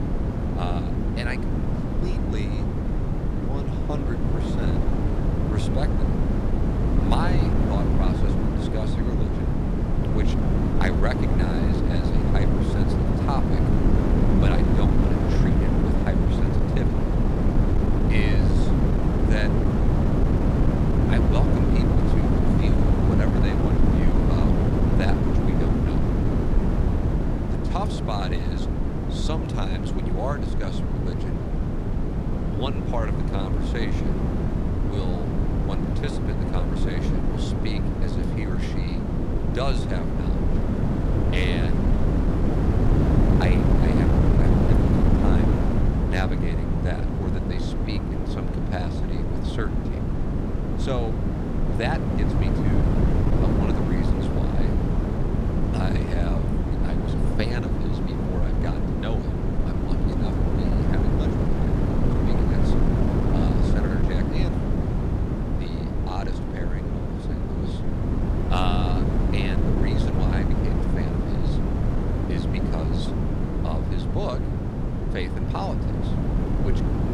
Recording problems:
wind noise on the microphone; heavy; 3 dB above the speech

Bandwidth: 14.5 kHz